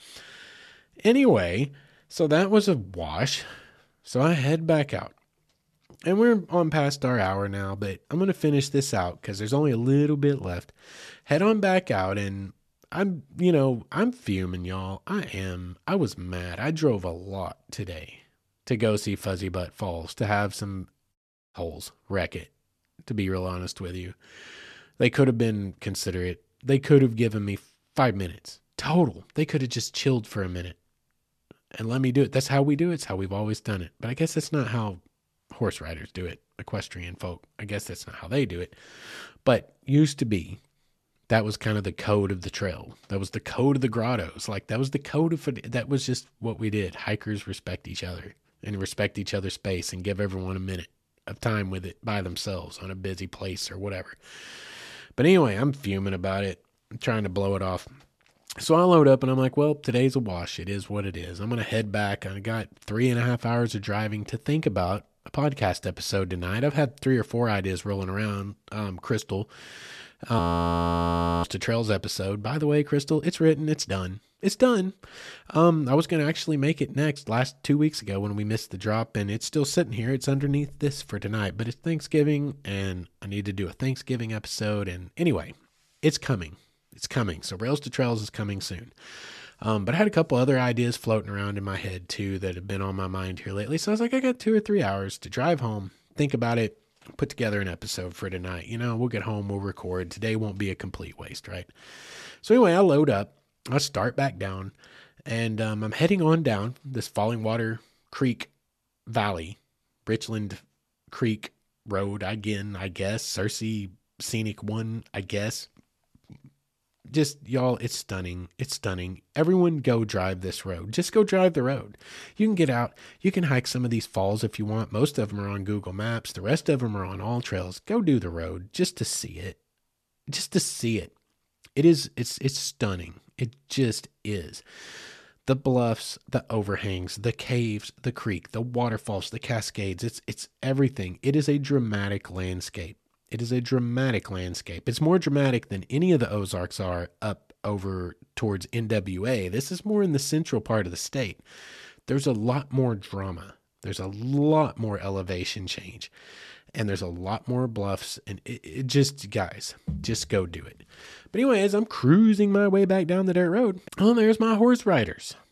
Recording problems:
audio freezing; at 1:10 for 1 s

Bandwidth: 13.5 kHz